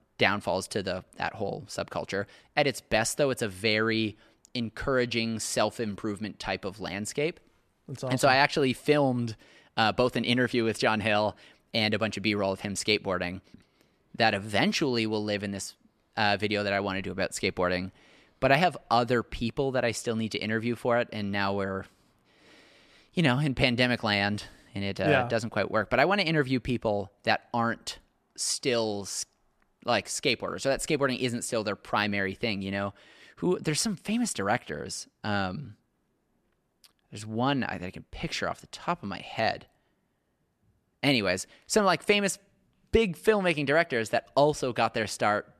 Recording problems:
none

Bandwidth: 13.5 kHz